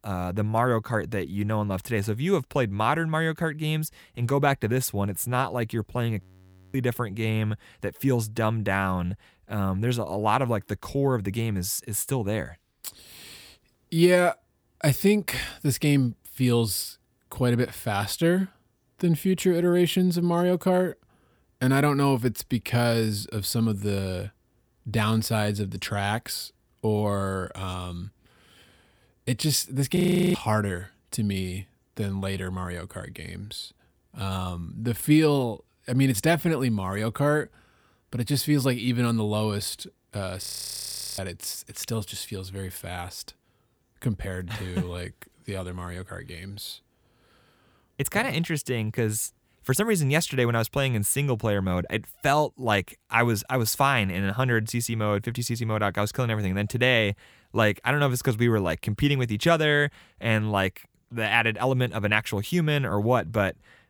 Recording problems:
audio freezing; at 6 s for 0.5 s, at 30 s and at 40 s for 1 s

